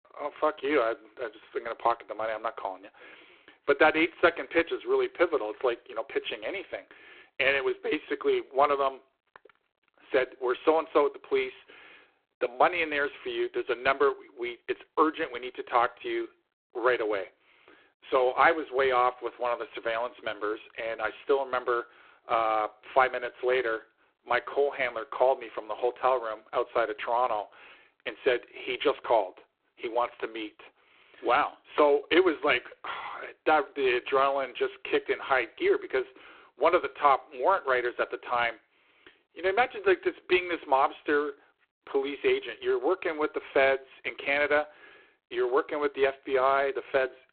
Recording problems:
phone-call audio; poor line; nothing above 4 kHz

